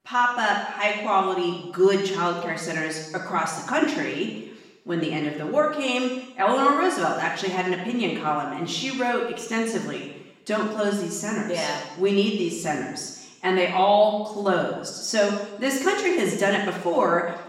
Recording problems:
off-mic speech; far
room echo; noticeable; dies away in 0.9 s

